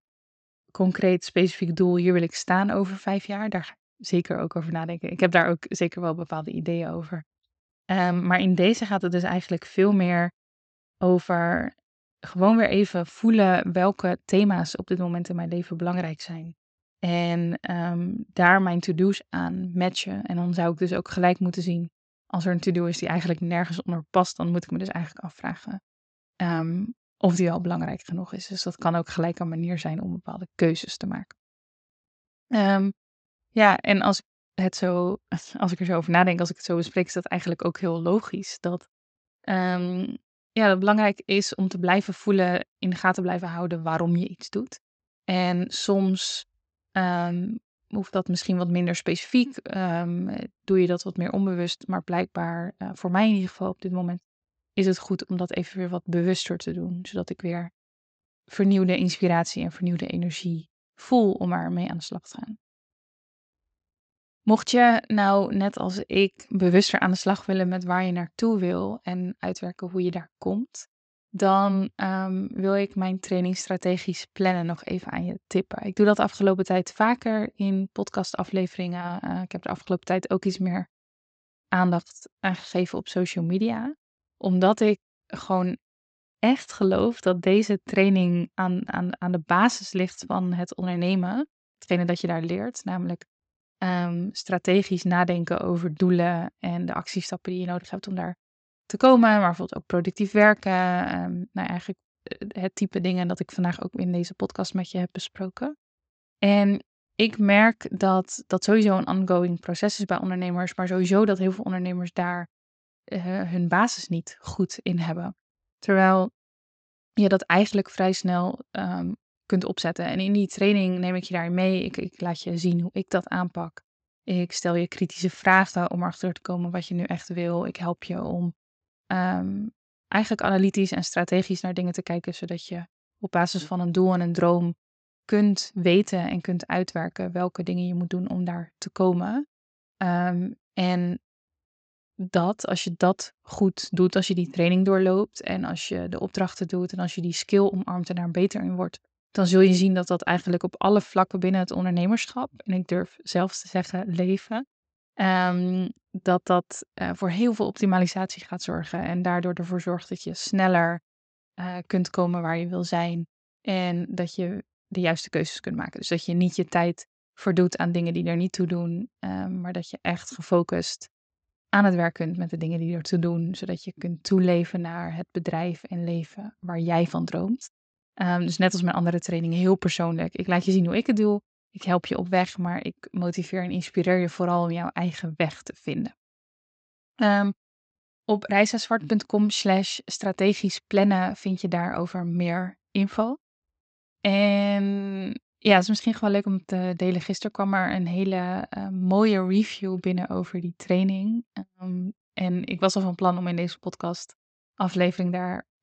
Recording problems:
high frequencies cut off; noticeable; nothing above 8 kHz

